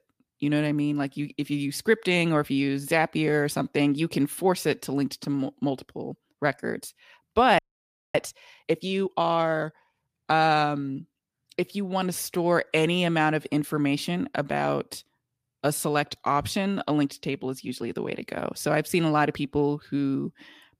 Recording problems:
audio freezing; at 7.5 s for 0.5 s

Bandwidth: 15 kHz